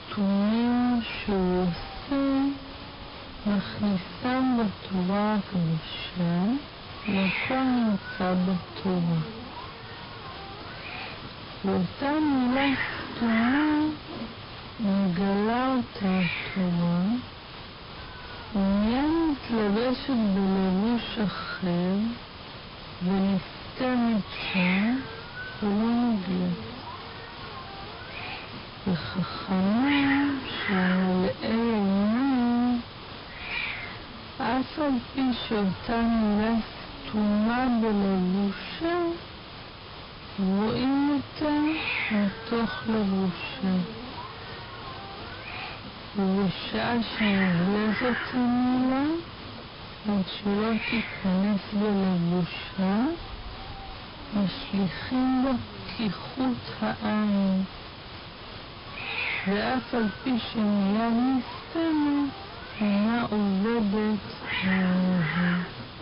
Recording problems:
distortion; heavy; 5 dB below the speech
wrong speed, natural pitch; too slow; 0.5 times normal speed
high frequencies cut off; noticeable; nothing above 5.5 kHz
hiss; loud; throughout; 9 dB below the speech

